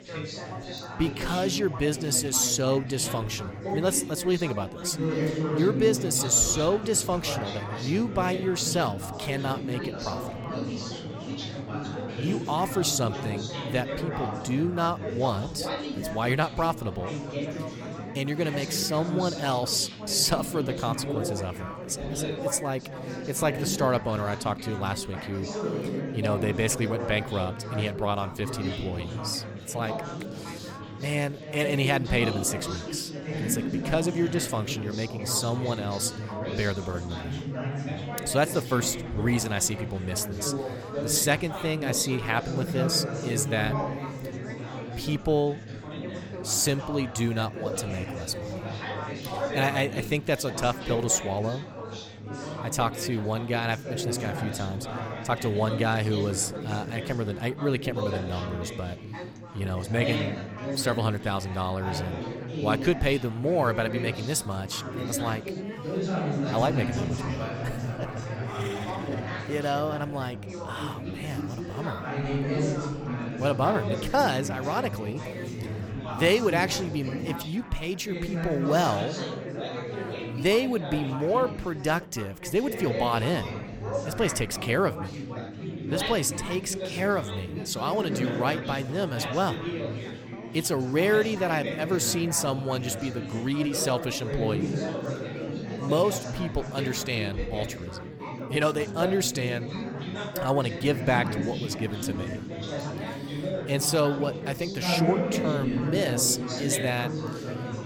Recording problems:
chatter from many people; loud; throughout; 5 dB below the speech

